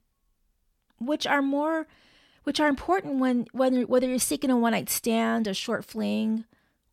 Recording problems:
none

